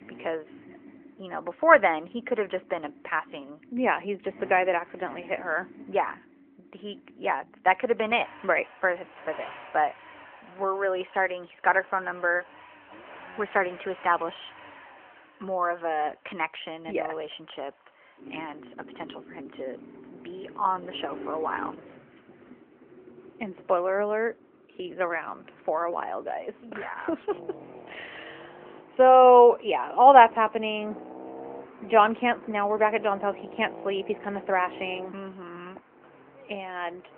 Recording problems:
phone-call audio; nothing above 3 kHz
traffic noise; faint; throughout; 20 dB below the speech

